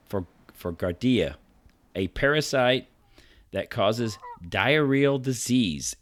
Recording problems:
animal sounds; faint; throughout; 30 dB below the speech

